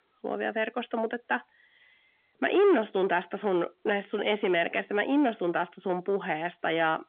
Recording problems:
phone-call audio; nothing above 3.5 kHz
distortion; slight; 10 dB below the speech

